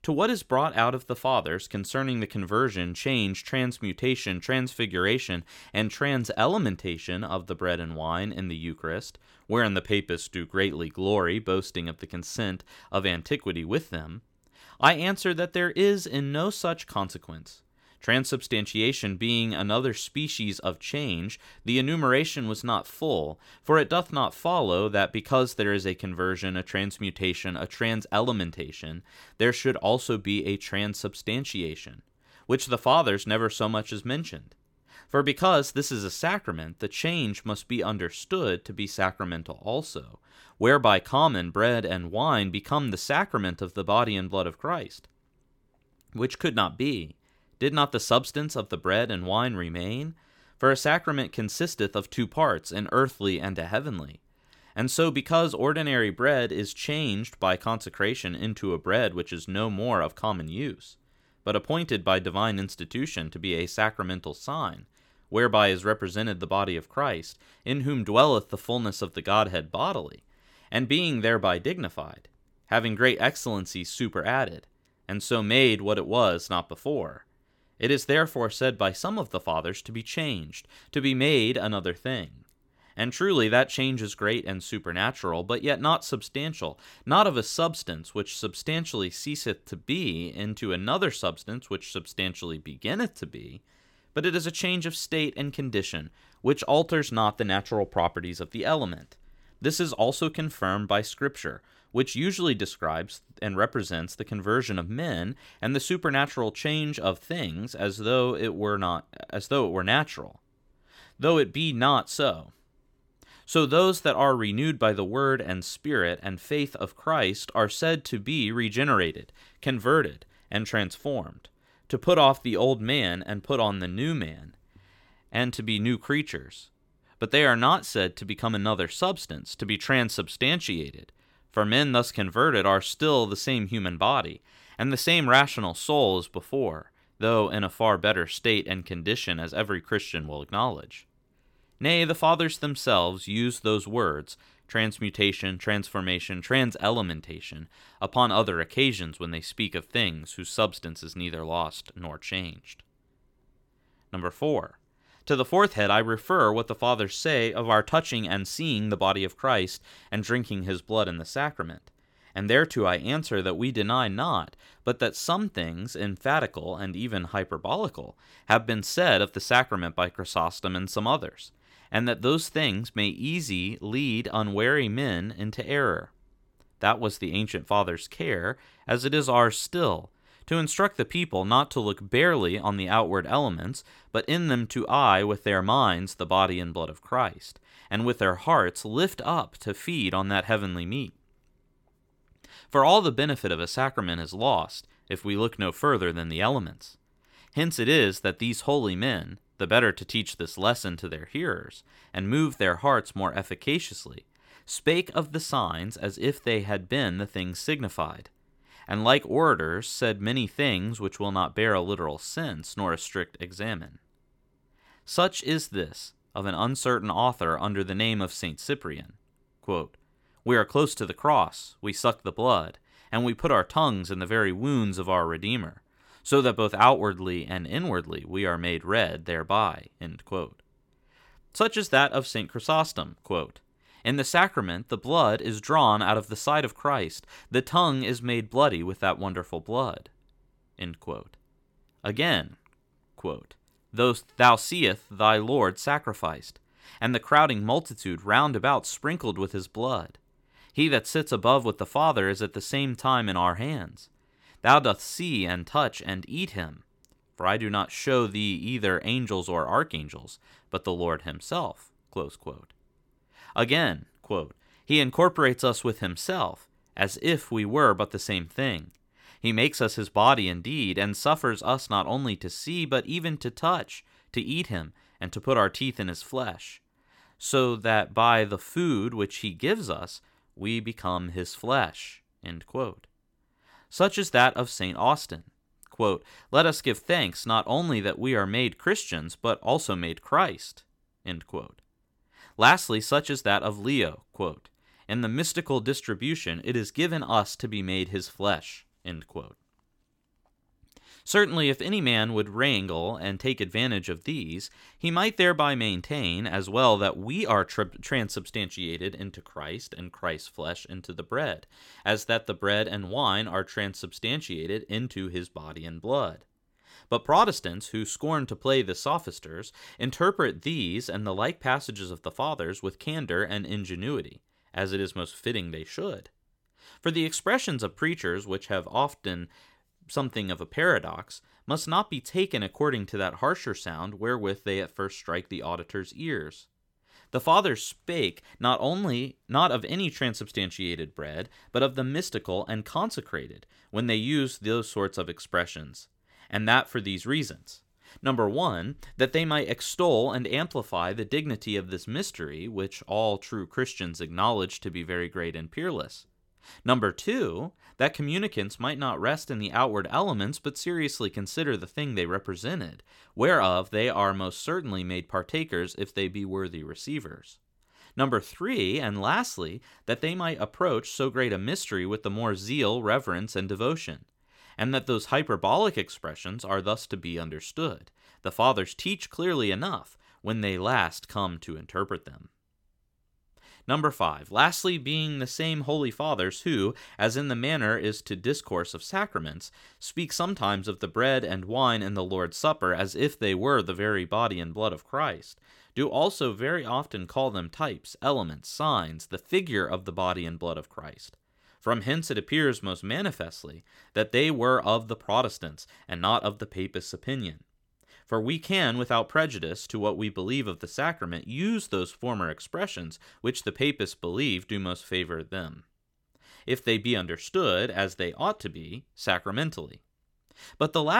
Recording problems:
abrupt cut into speech; at the end

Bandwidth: 17 kHz